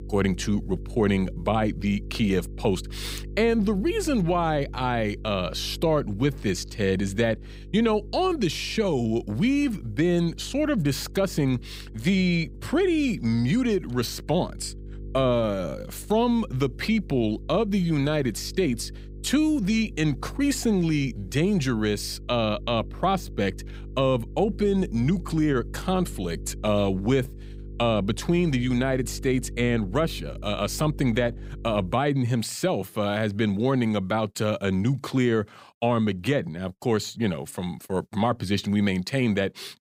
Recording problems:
electrical hum; faint; until 32 s; 50 Hz, 25 dB below the speech

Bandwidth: 15.5 kHz